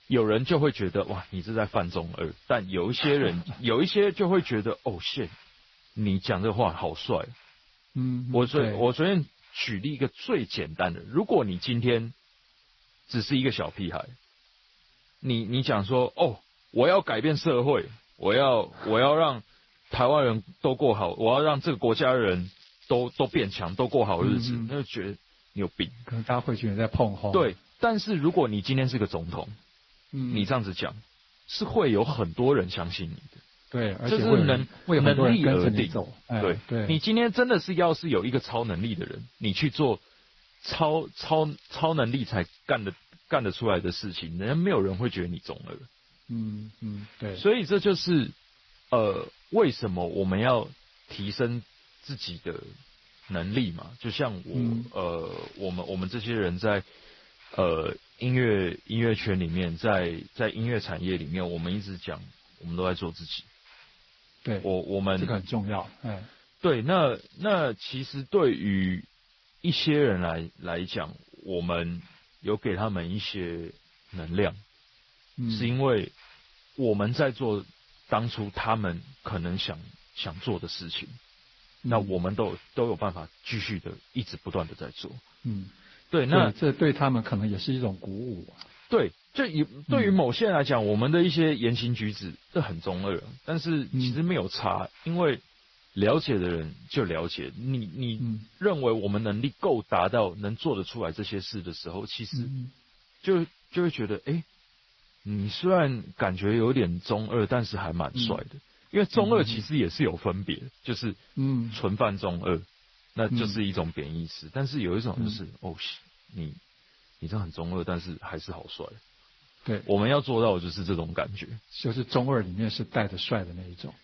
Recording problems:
garbled, watery; slightly; nothing above 5.5 kHz
high frequencies cut off; slight
hiss; faint; throughout; 30 dB below the speech
crackling; faint; 4 times, first at 22 s; 25 dB below the speech

